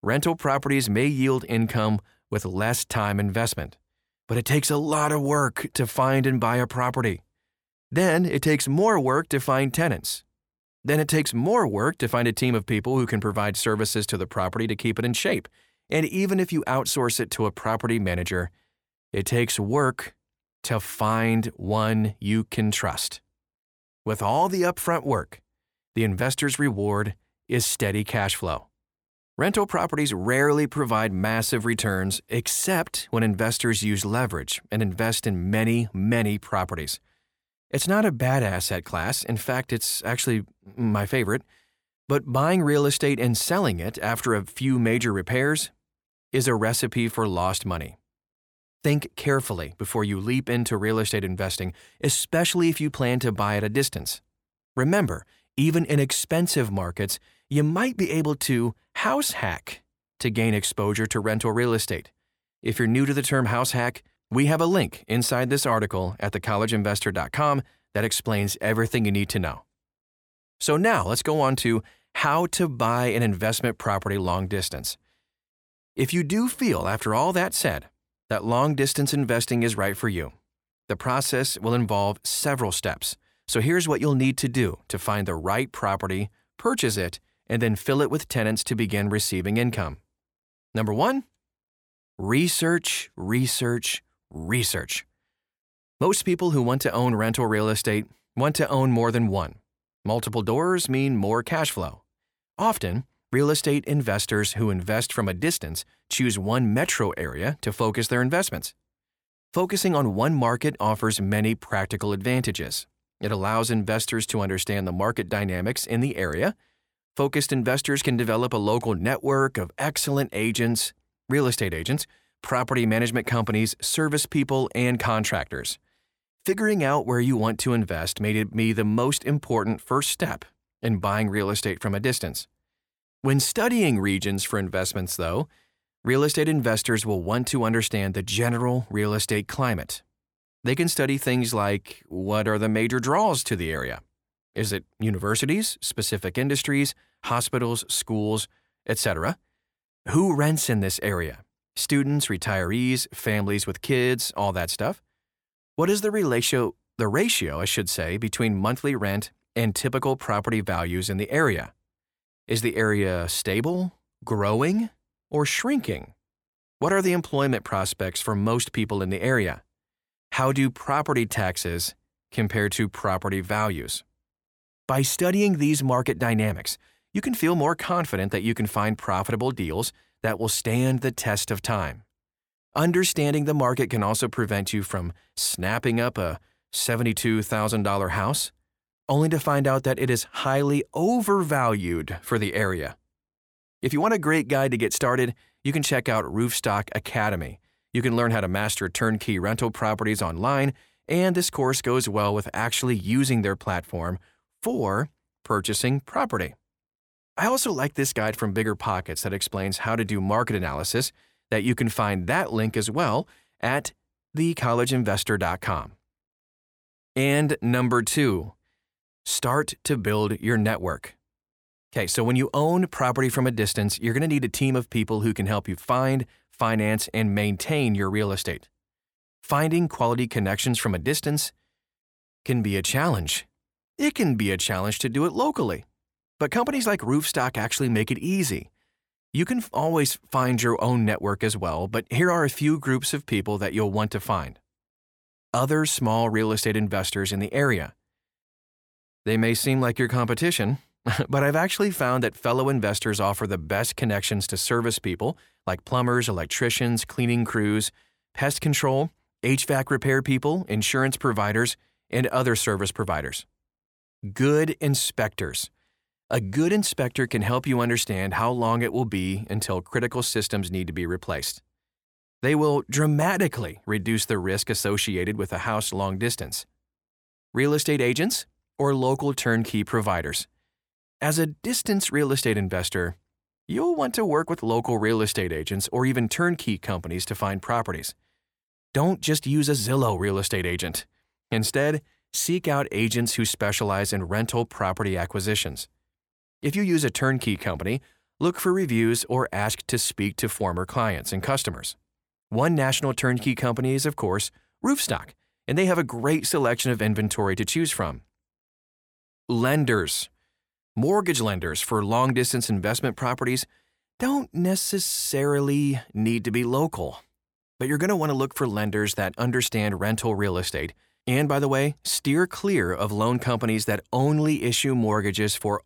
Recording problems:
none

